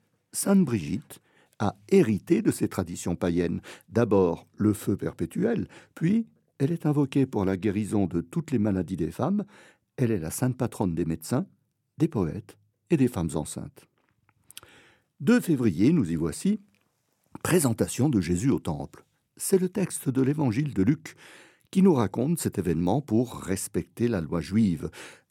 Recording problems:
none

